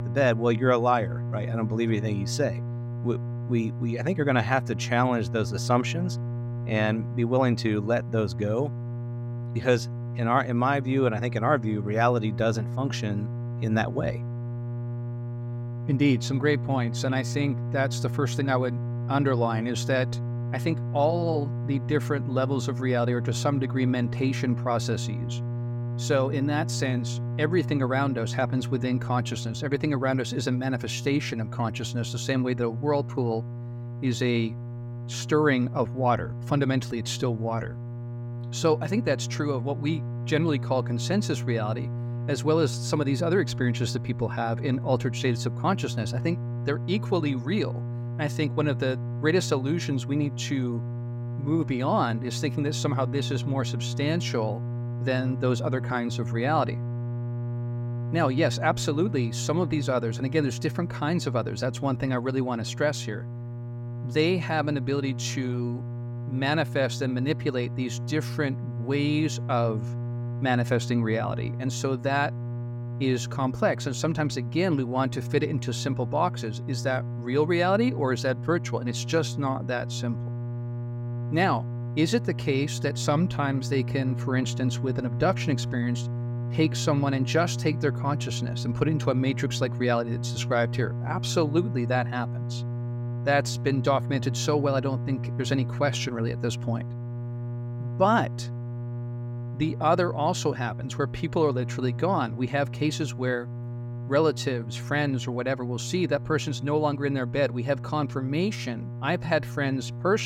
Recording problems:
electrical hum; noticeable; throughout; 60 Hz, 15 dB below the speech
abrupt cut into speech; at the end

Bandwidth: 16 kHz